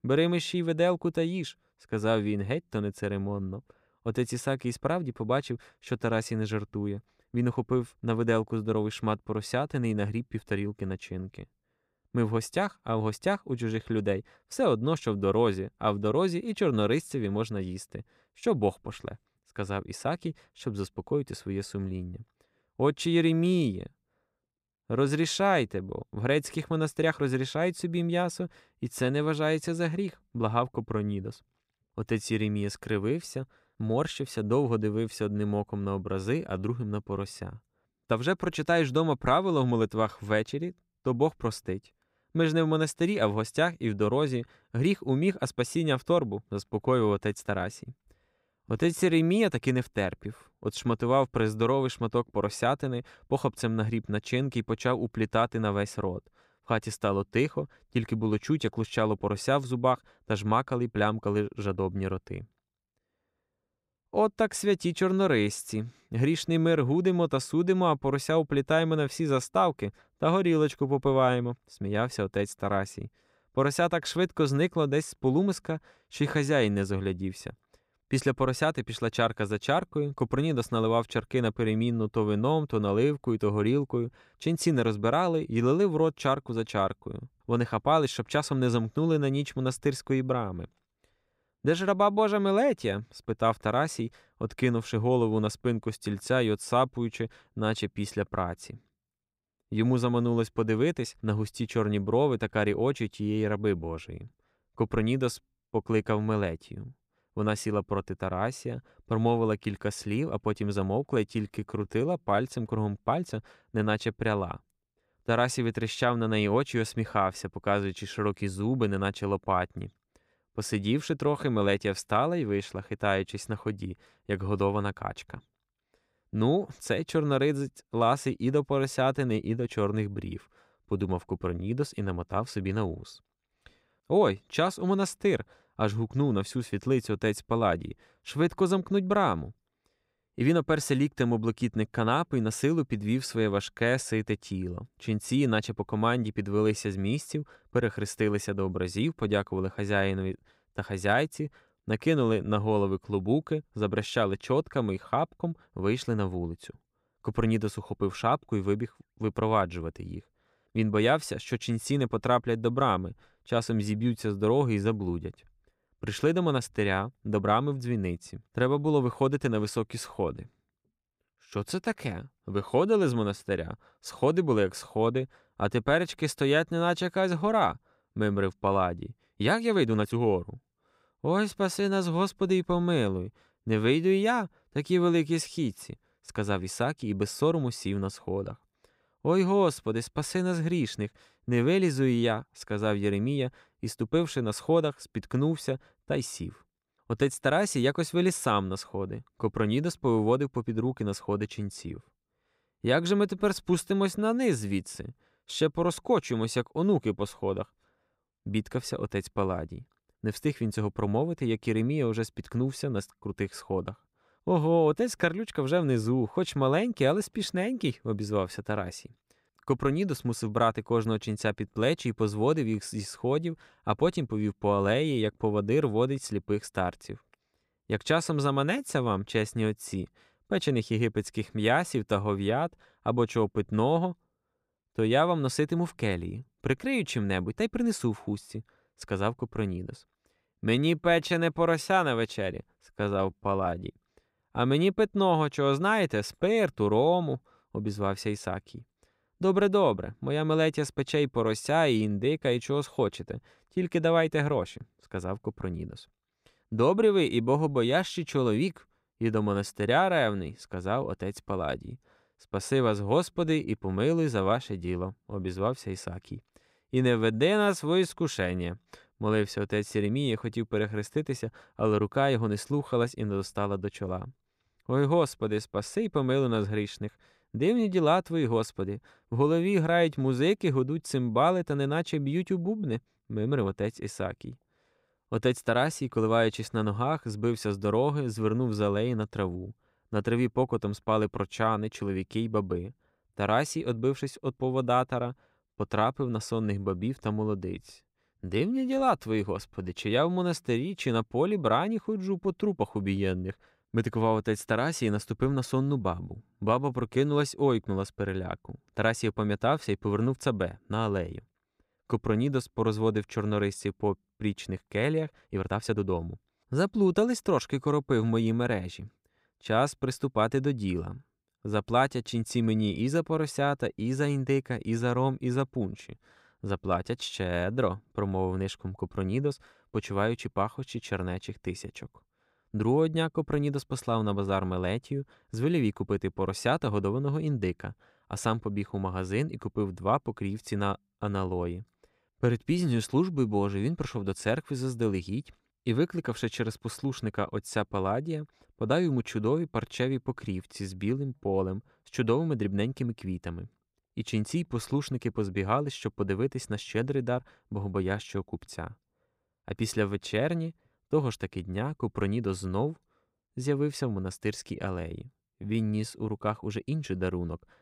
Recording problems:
uneven, jittery; strongly; from 27 s to 6:06

